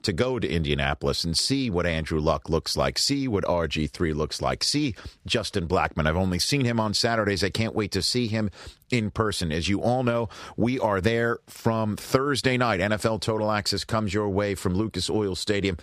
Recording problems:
none

